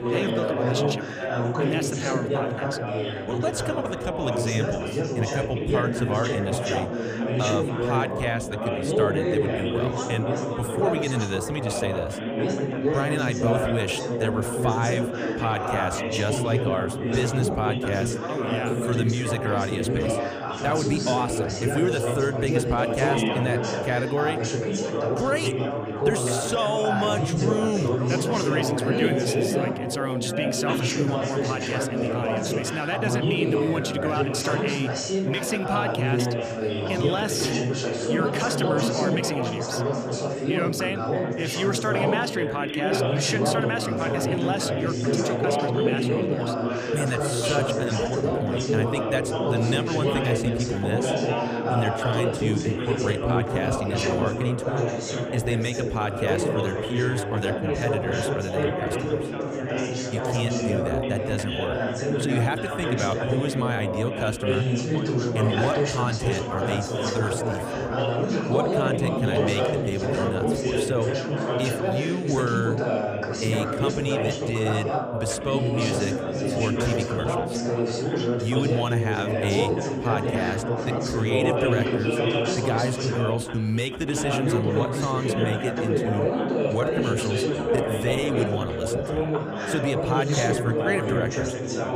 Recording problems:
chatter from many people; very loud; throughout; 3 dB above the speech

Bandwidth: 15 kHz